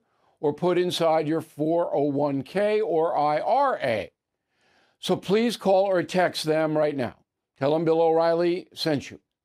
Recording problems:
none

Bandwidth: 15.5 kHz